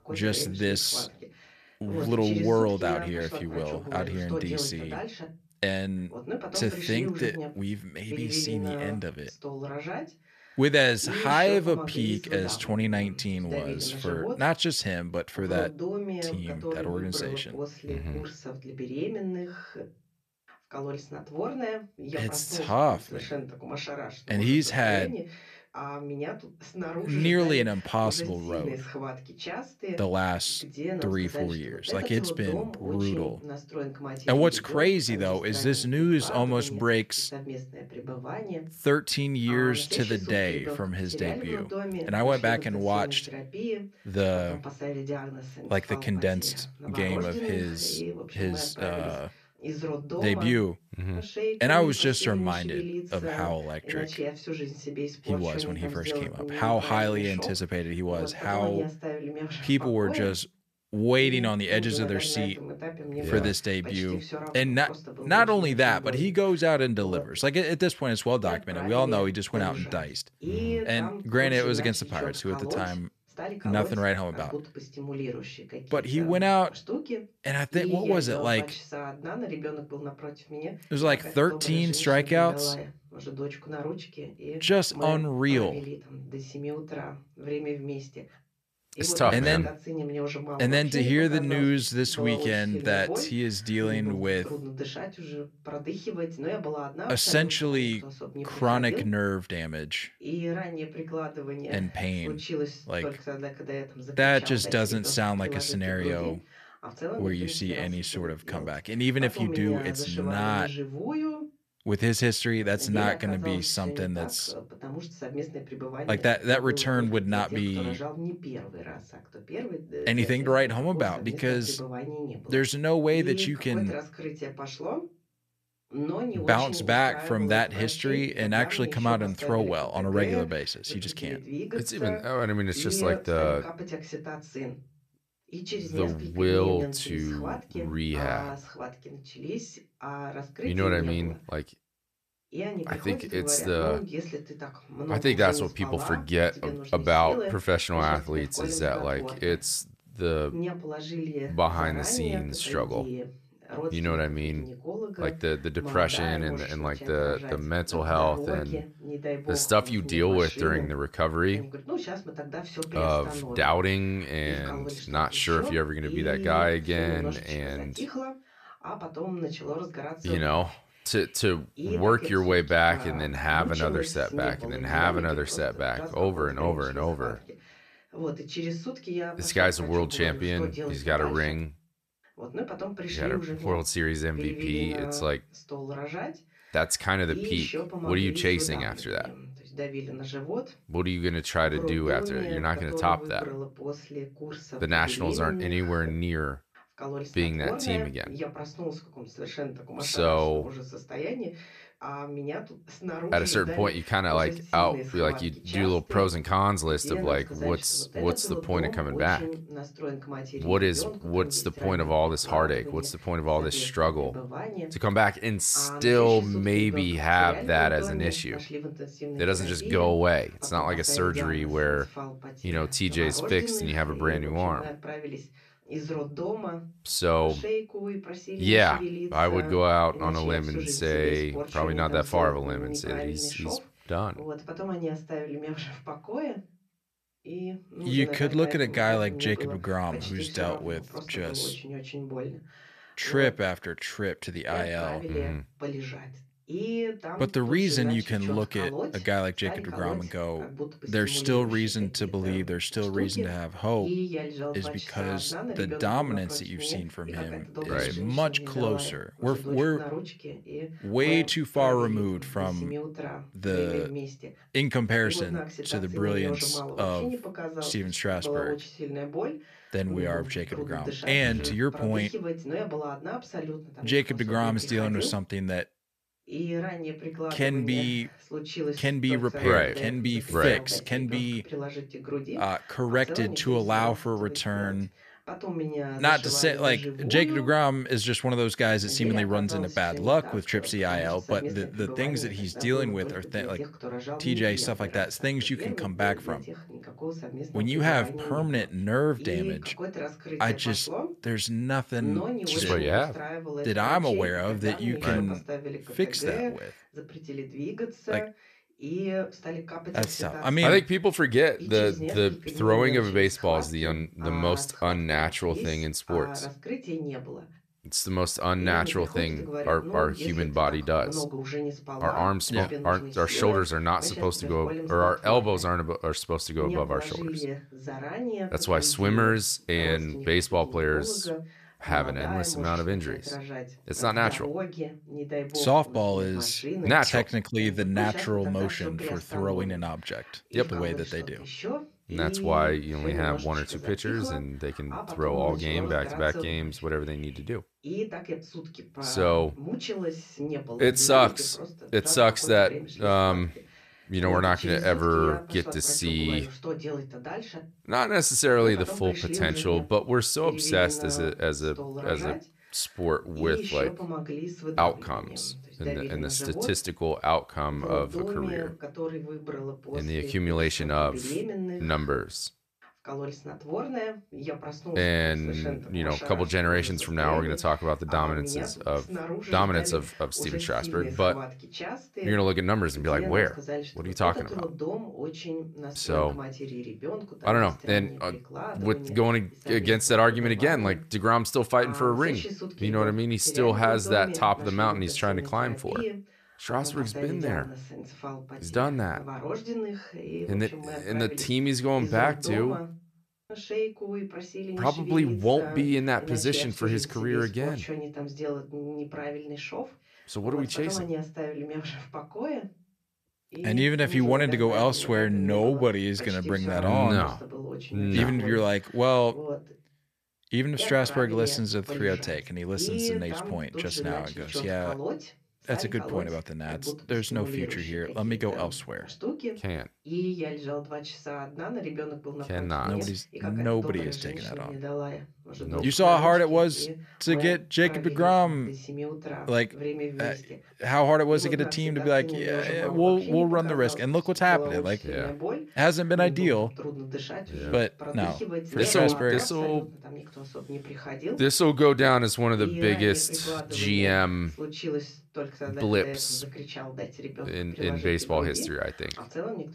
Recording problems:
voice in the background; loud; throughout; 9 dB below the speech

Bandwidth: 14.5 kHz